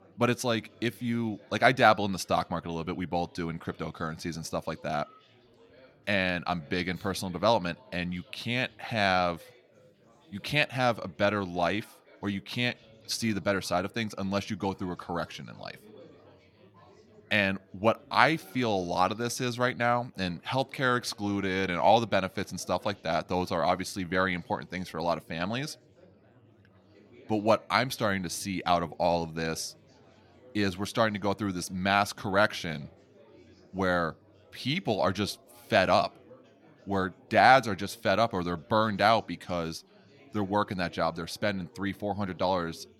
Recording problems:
chatter from many people; faint; throughout; 30 dB below the speech

